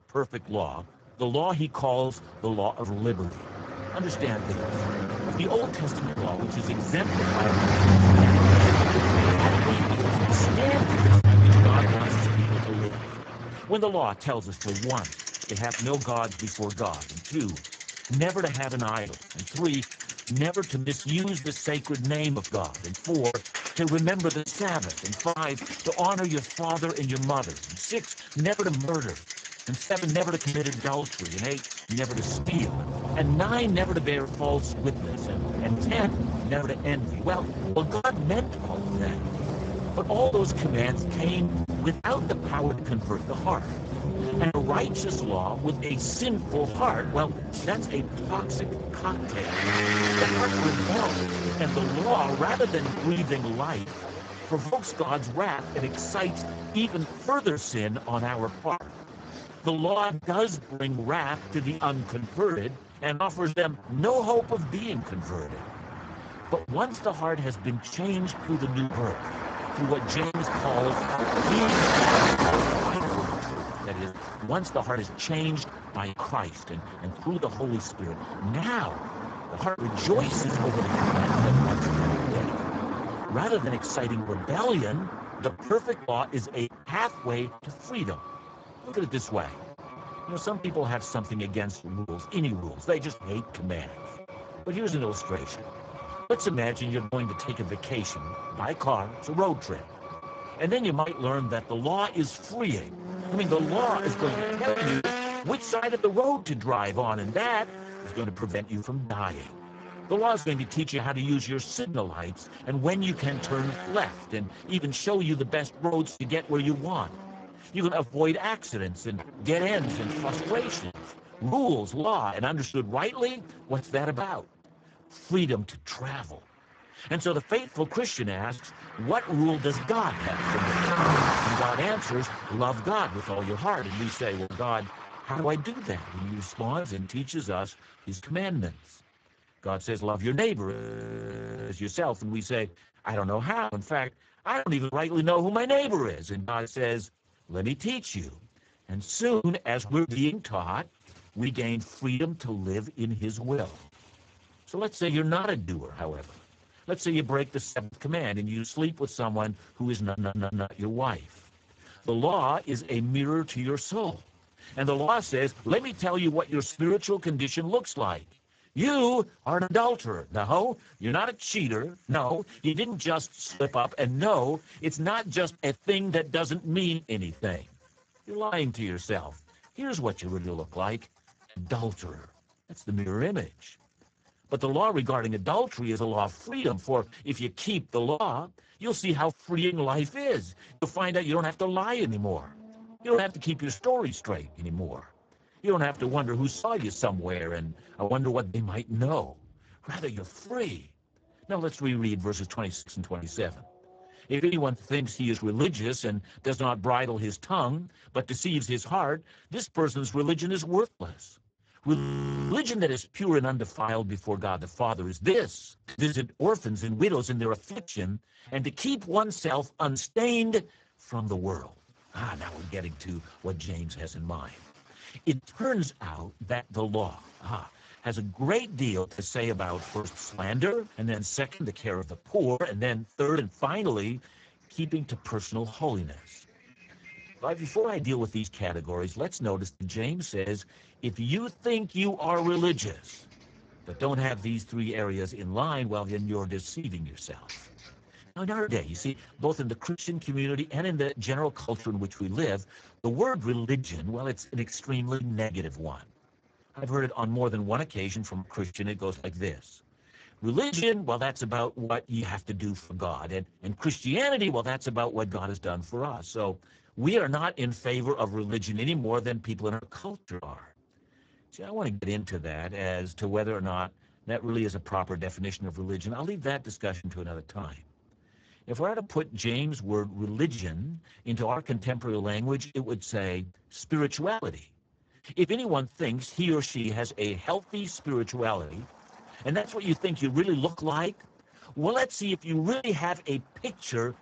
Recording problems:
garbled, watery; badly; nothing above 7.5 kHz
traffic noise; loud; throughout; as loud as the speech
choppy; very; 7% of the speech affected
audio freezing; at 2:21 for 1 s and at 3:32 for 0.5 s
audio stuttering; at 2:40

